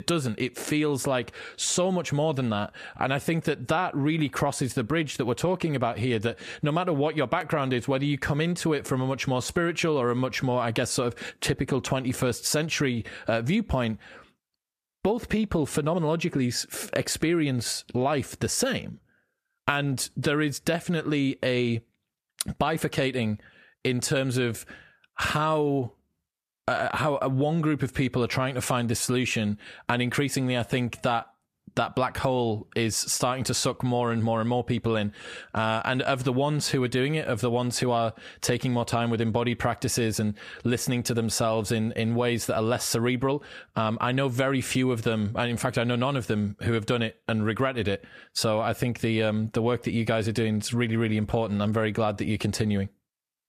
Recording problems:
squashed, flat; somewhat

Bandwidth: 14.5 kHz